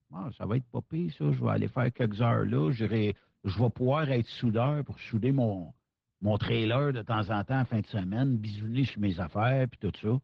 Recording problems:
muffled; slightly; fading above 4 kHz
garbled, watery; slightly

